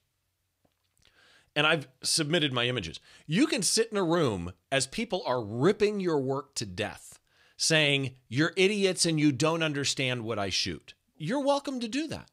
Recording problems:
none

